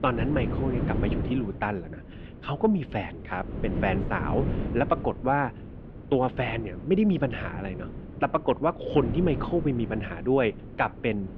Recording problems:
muffled; slightly; fading above 3 kHz
wind noise on the microphone; occasional gusts; 10 dB below the speech

